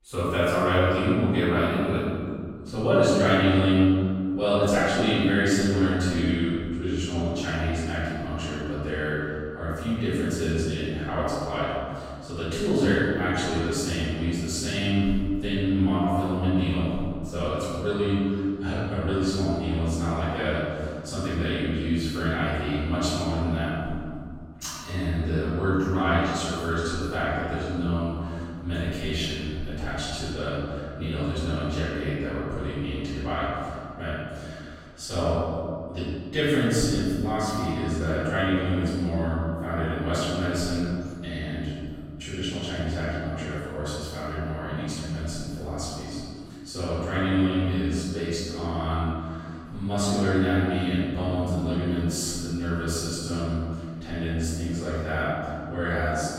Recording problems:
room echo; strong; dies away in 2.3 s
off-mic speech; far

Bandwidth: 16 kHz